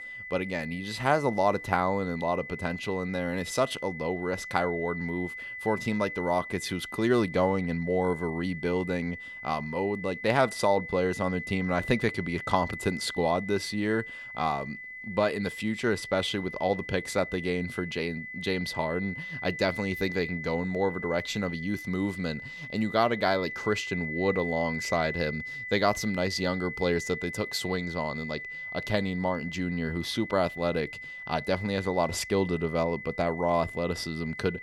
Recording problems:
high-pitched whine; loud; throughout; 2 kHz, 8 dB below the speech

